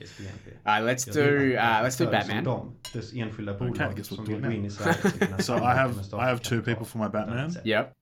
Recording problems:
voice in the background; loud; throughout; 8 dB below the speech
clattering dishes; faint; at 3 s; peak 15 dB below the speech

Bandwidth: 17 kHz